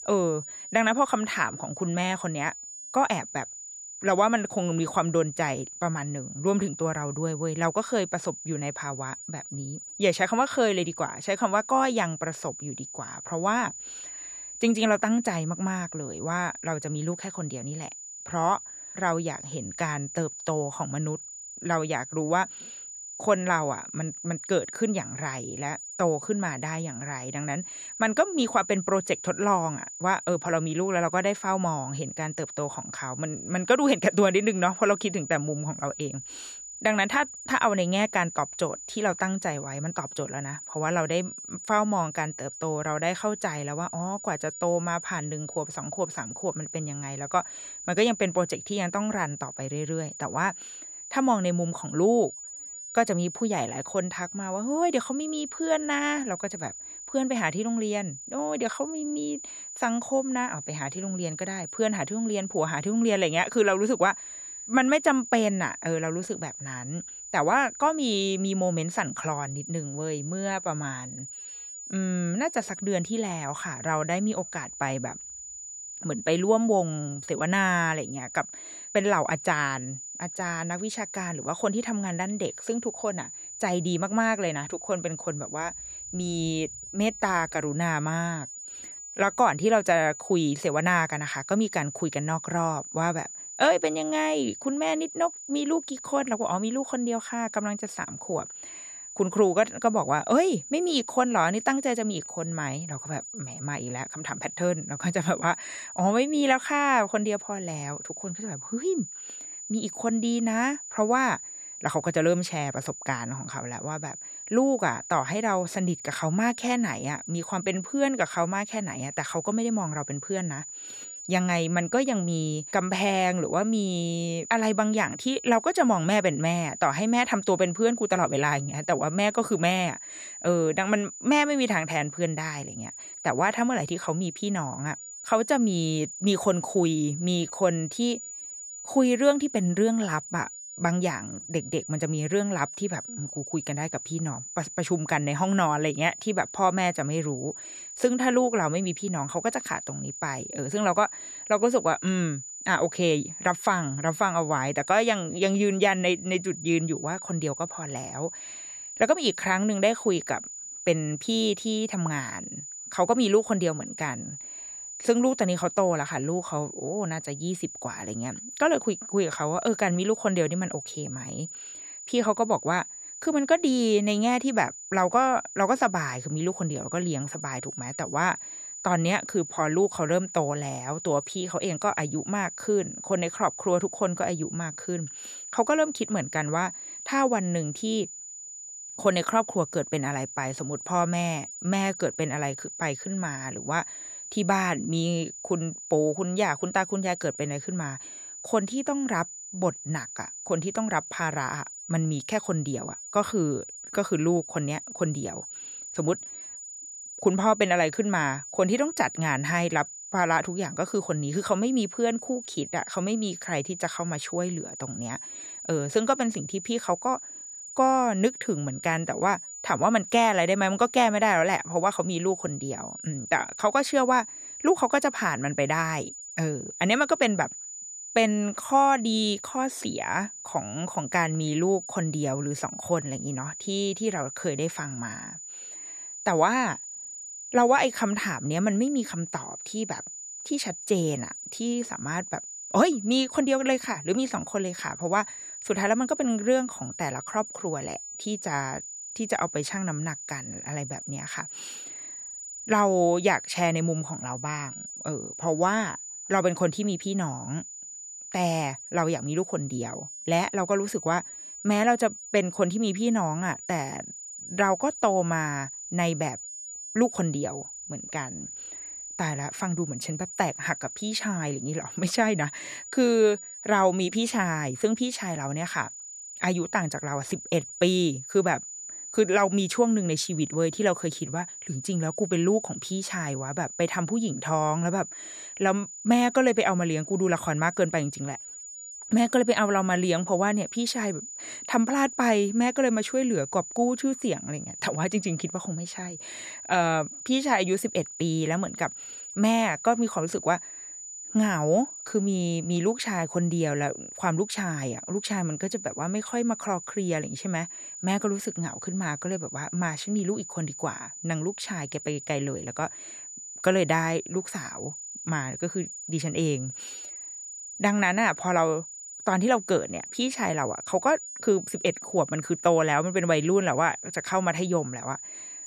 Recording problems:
high-pitched whine; noticeable; throughout; 7 kHz, 10 dB below the speech

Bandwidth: 14.5 kHz